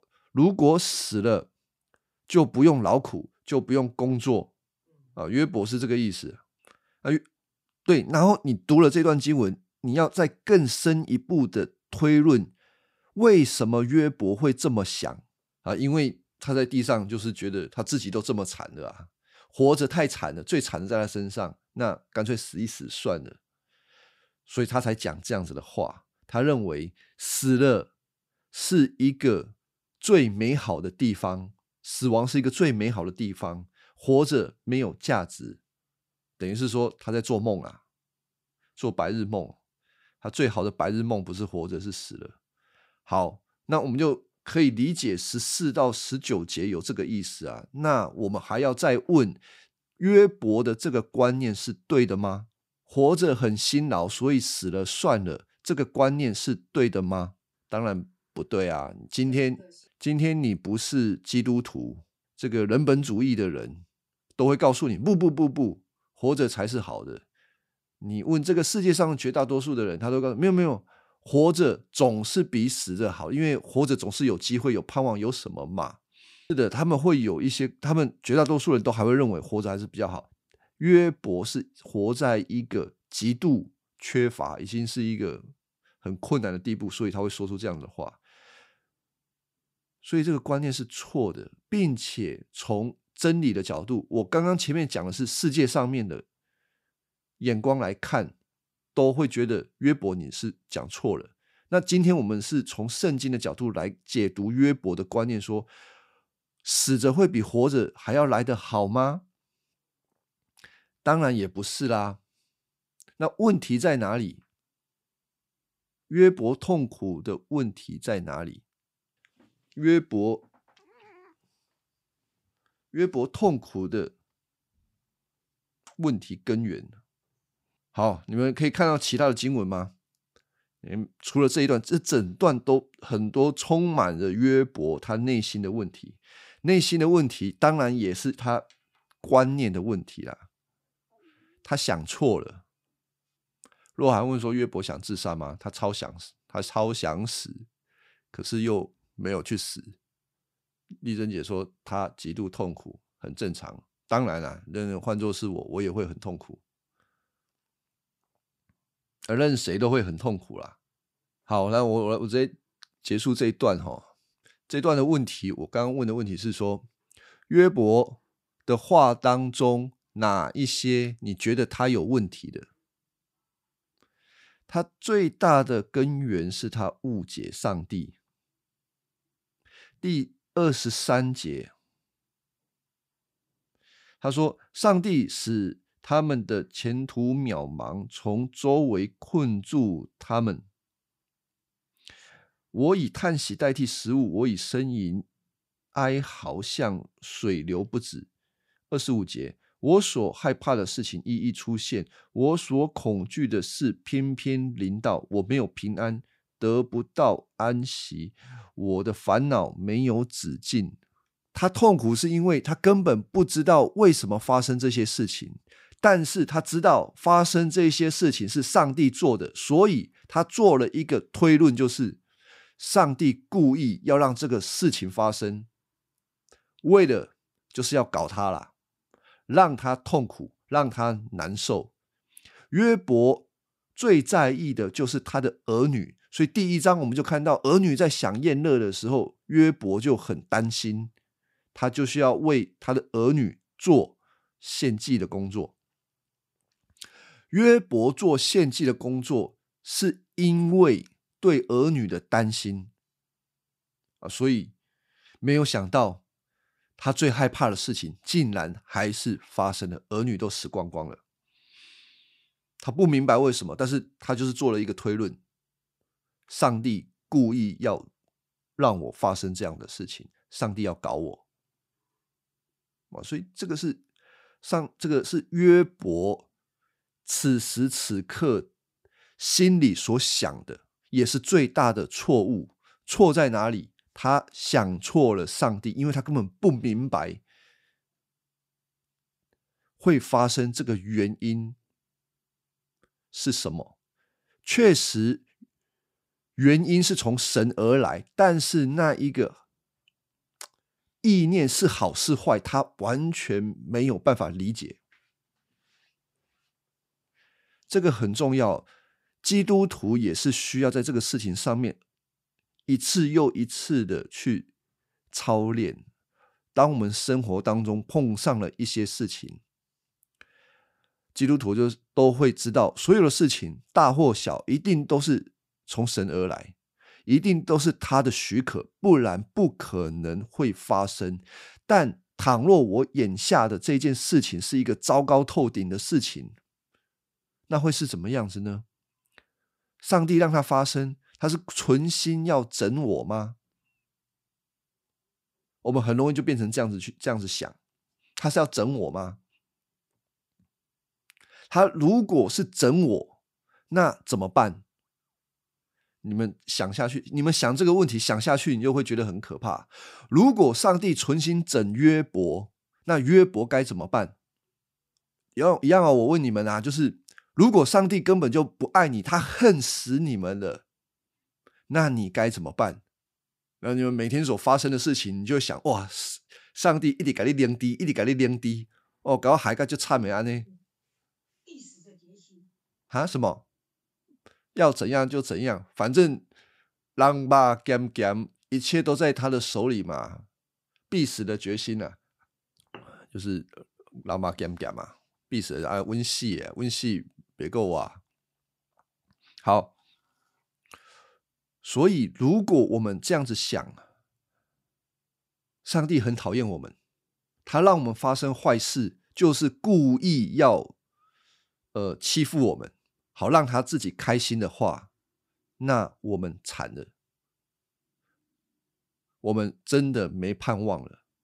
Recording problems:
none

